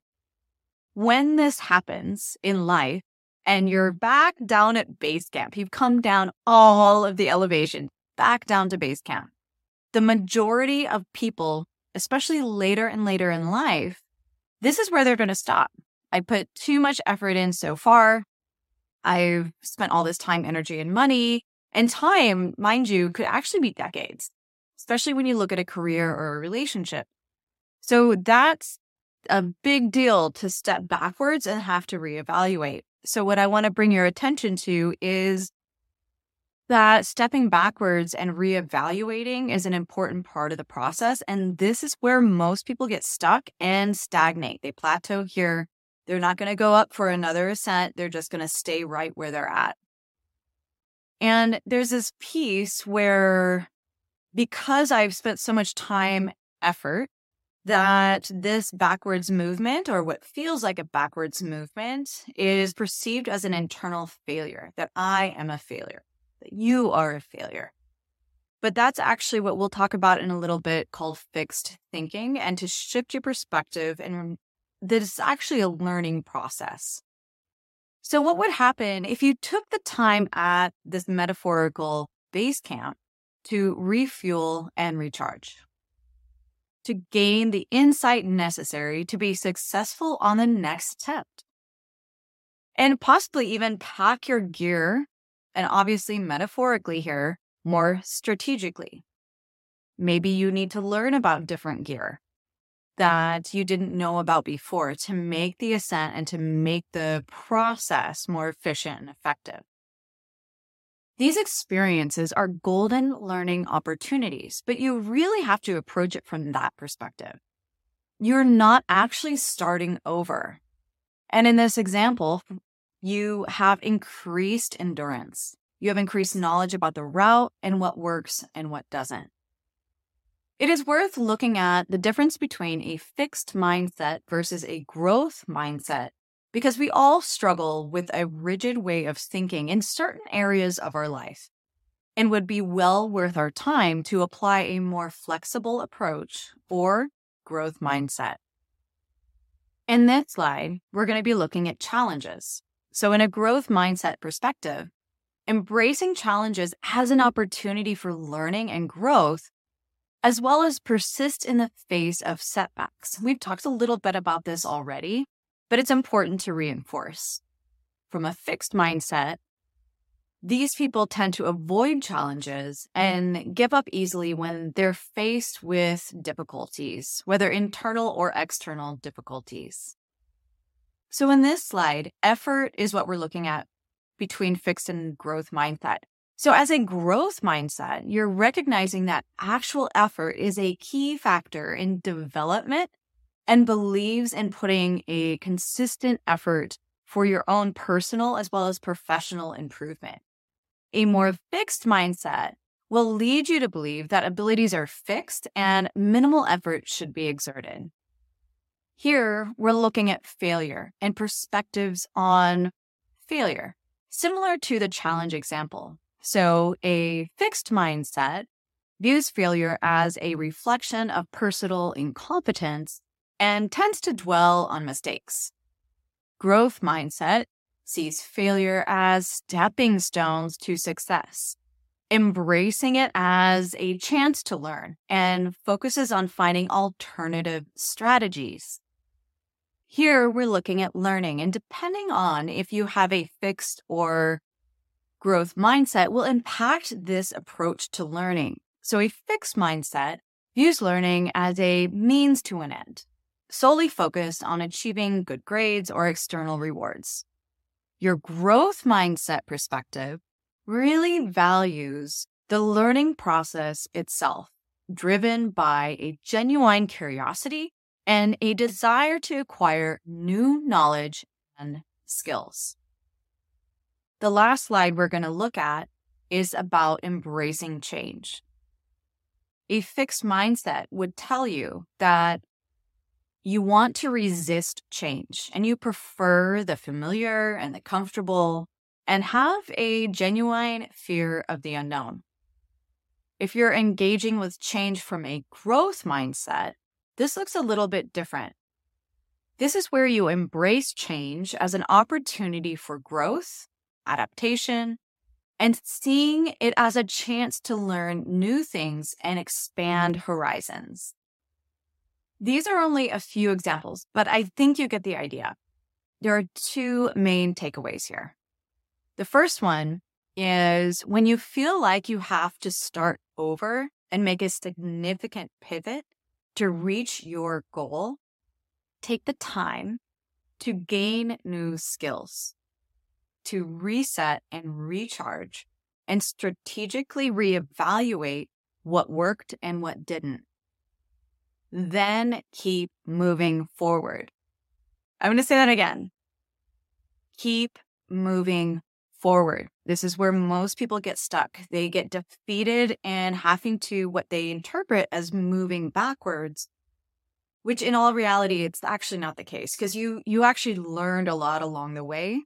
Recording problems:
none

